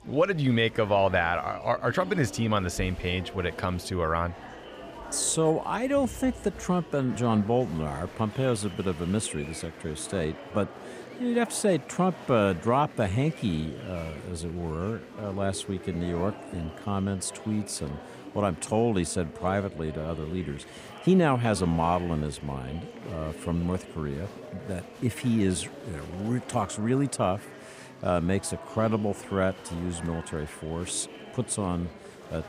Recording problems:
murmuring crowd; noticeable; throughout; 15 dB below the speech

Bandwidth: 15.5 kHz